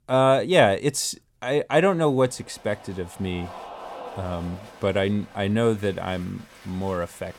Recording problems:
crowd noise; noticeable; from 2 s on; 20 dB below the speech

